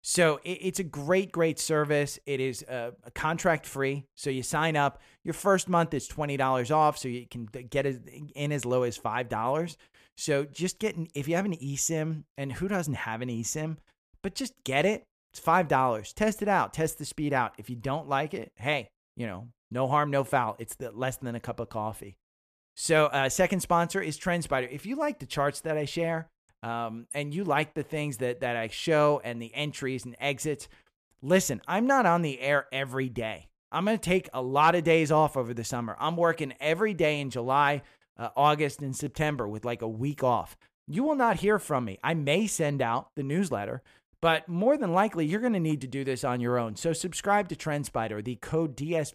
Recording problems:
none

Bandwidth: 14.5 kHz